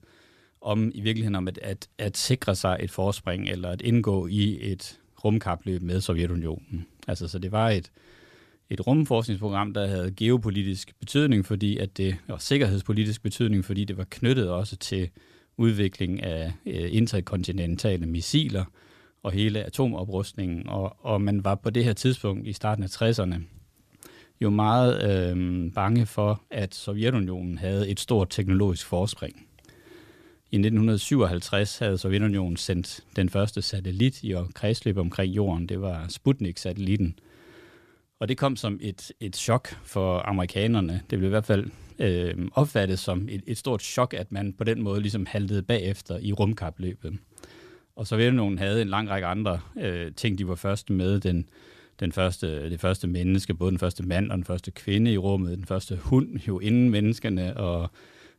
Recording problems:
none

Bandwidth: 14.5 kHz